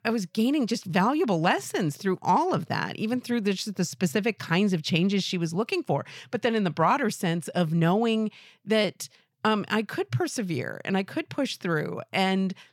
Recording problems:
none

